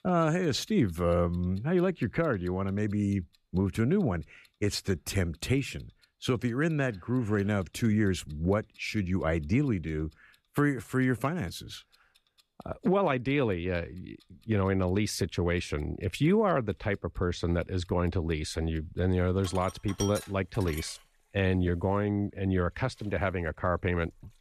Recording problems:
household noises; noticeable; throughout; 20 dB below the speech

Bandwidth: 14 kHz